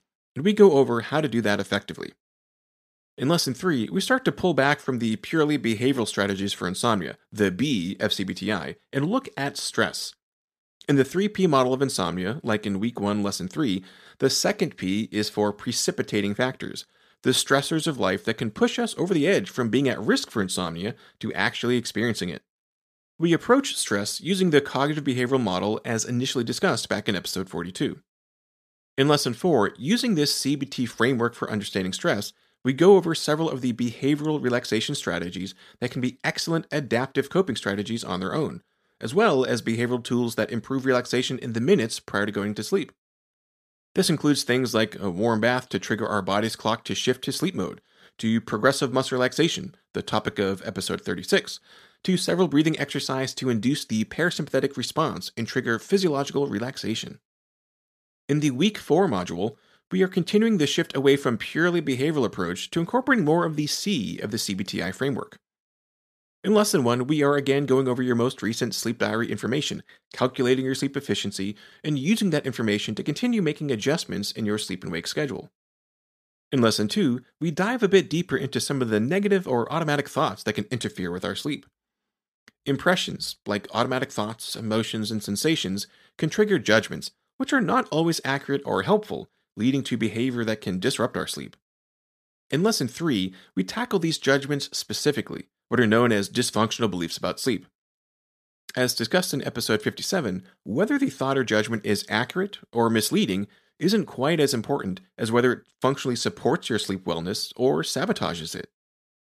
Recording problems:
none

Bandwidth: 14.5 kHz